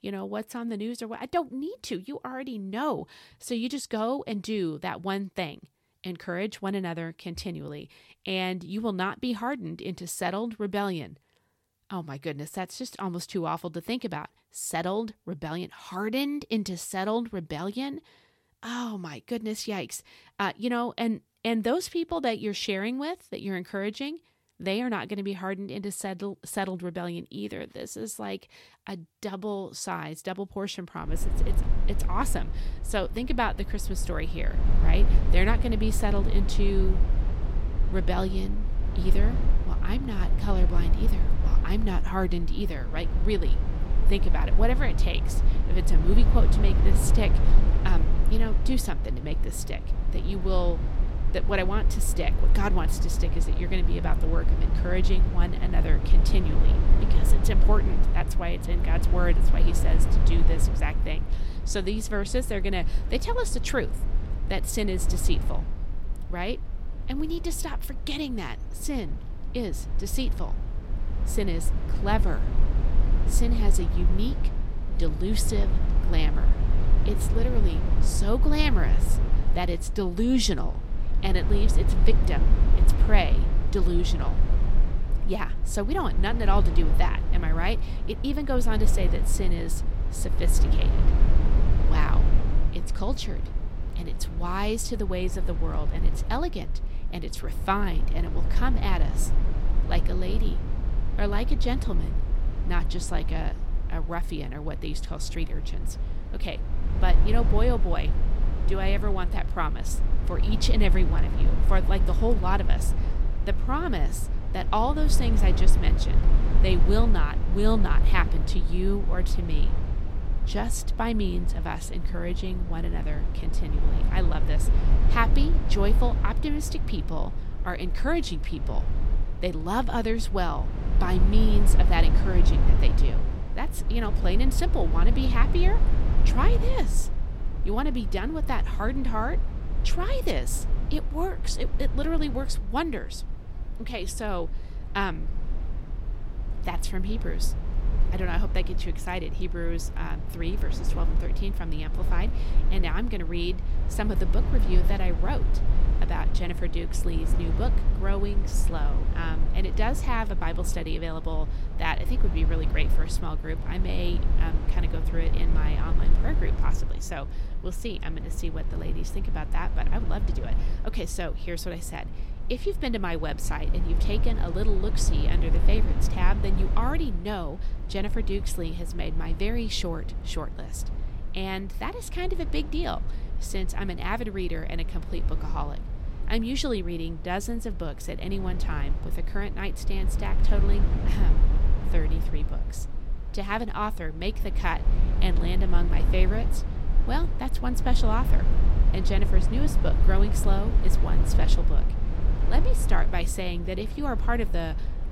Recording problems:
low rumble; loud; from 31 s on; 9 dB below the speech

